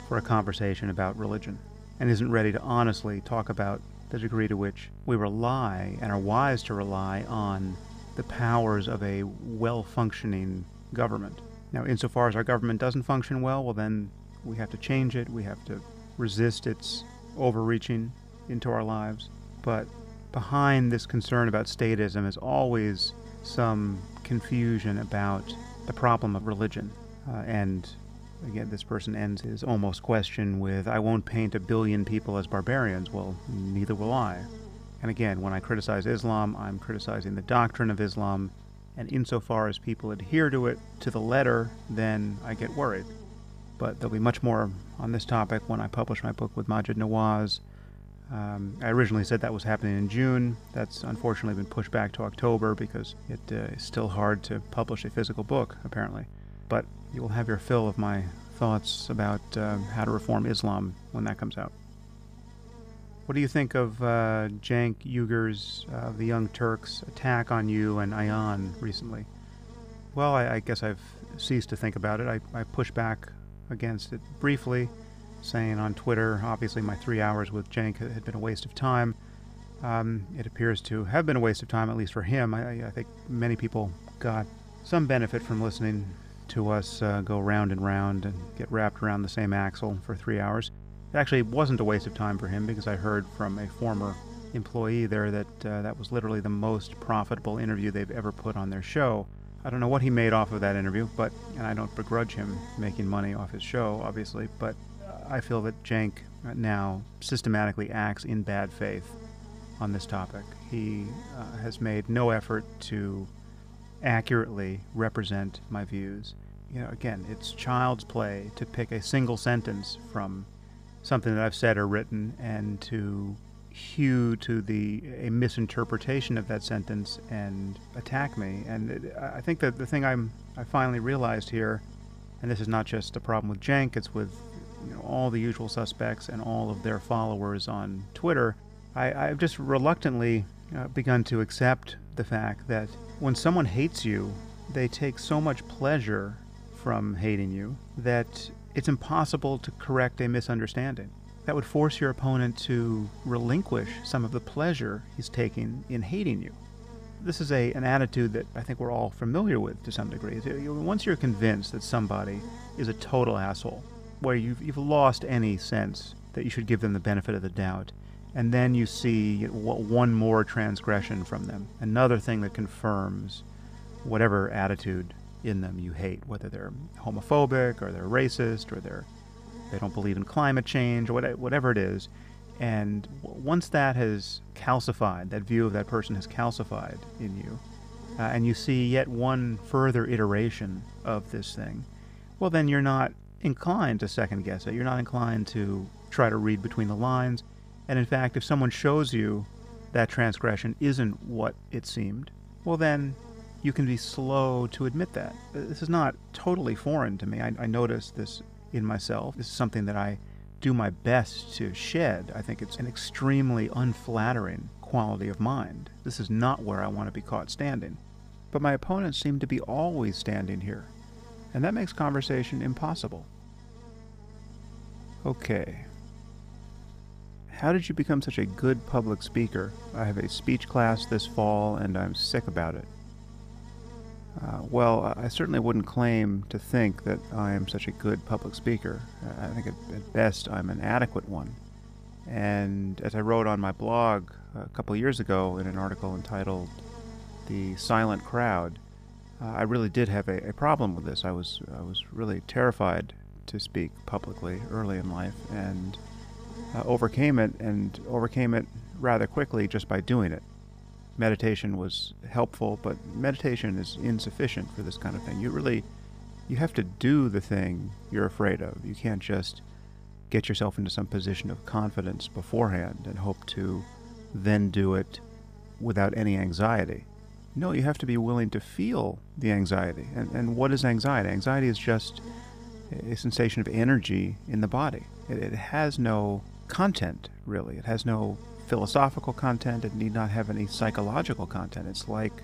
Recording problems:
electrical hum; faint; throughout; 50 Hz, 20 dB below the speech

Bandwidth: 15 kHz